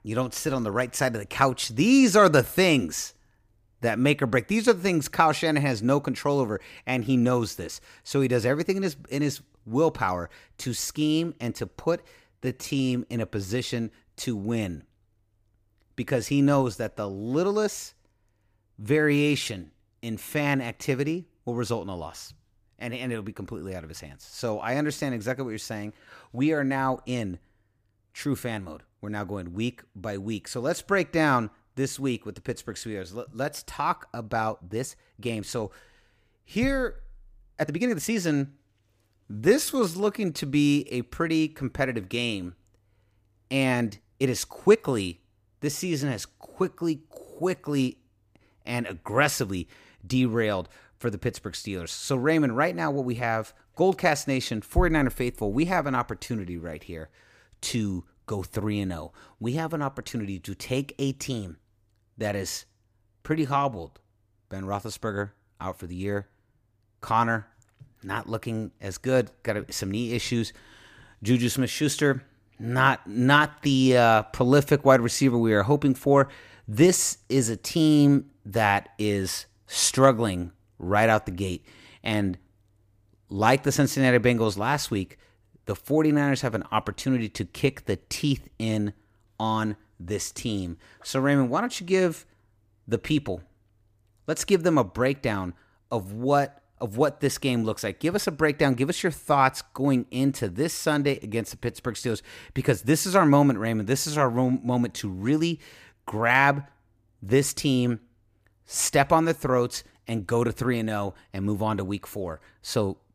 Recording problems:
uneven, jittery; strongly; from 12 s to 1:42

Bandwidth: 15 kHz